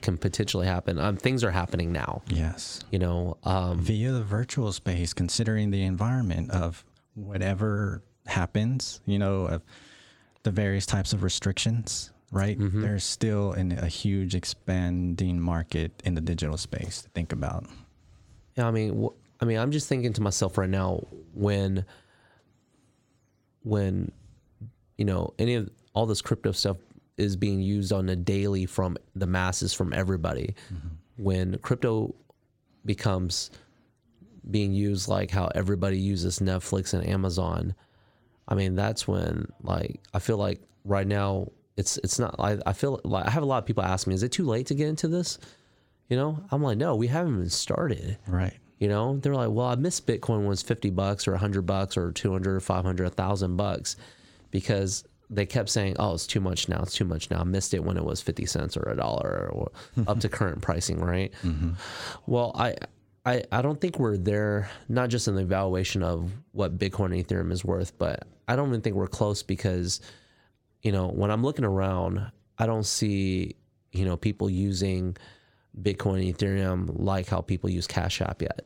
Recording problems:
squashed, flat; somewhat

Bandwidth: 16.5 kHz